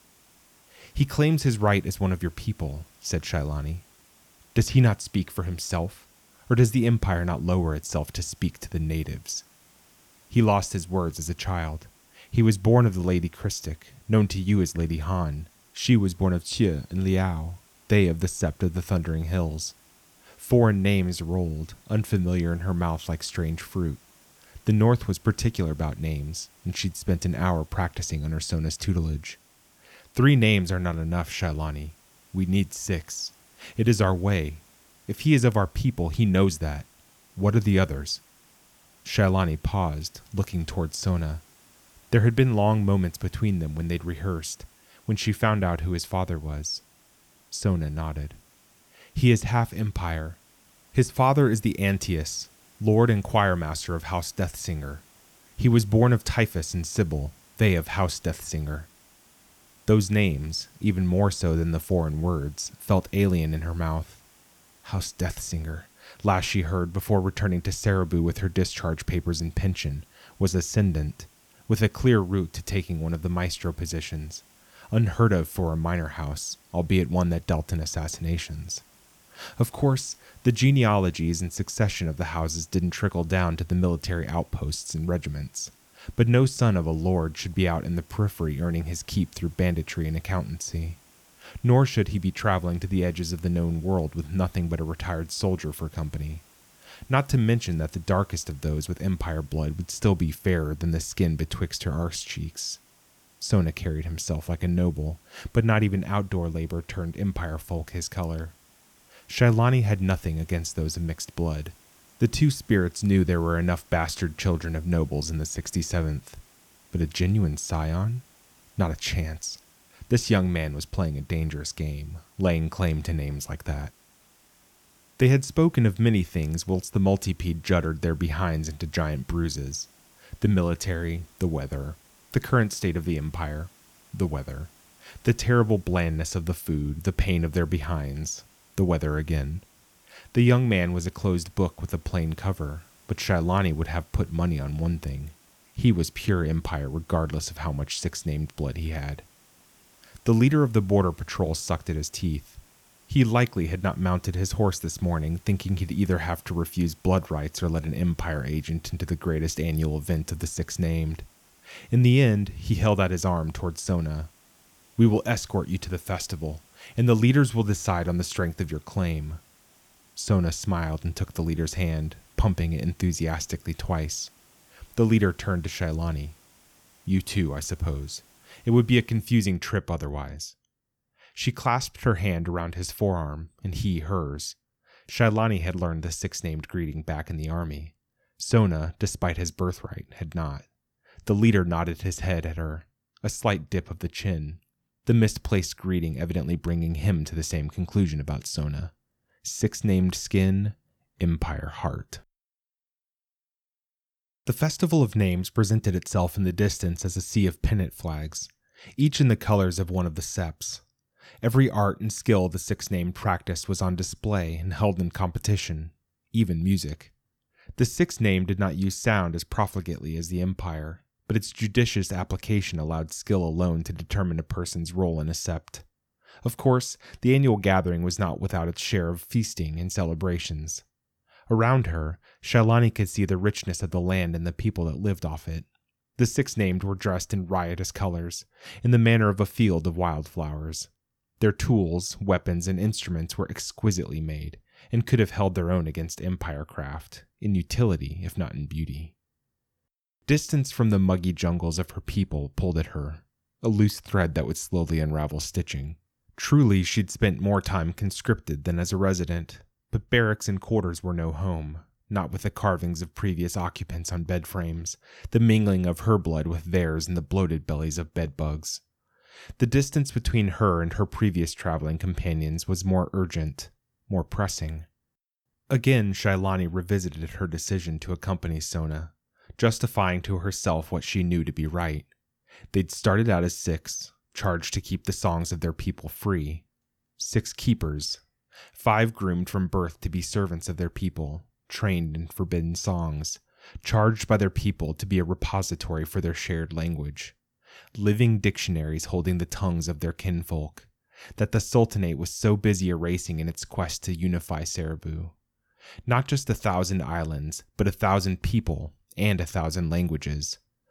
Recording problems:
hiss; faint; until 2:59; 30 dB below the speech

